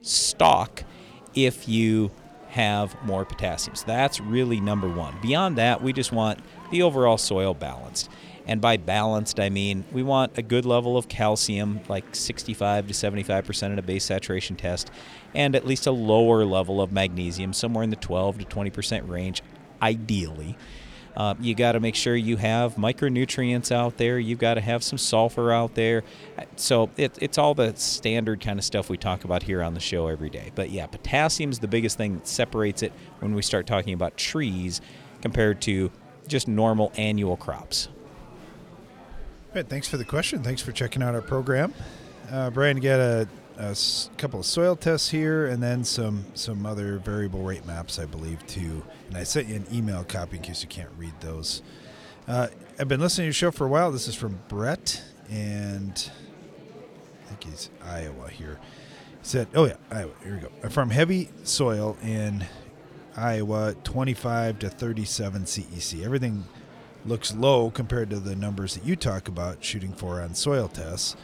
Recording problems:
murmuring crowd; faint; throughout; 20 dB below the speech

